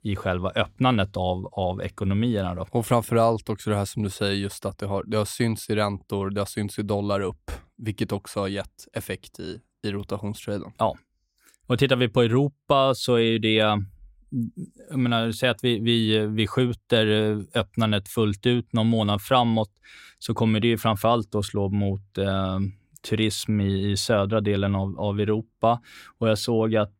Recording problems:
none

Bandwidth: 16 kHz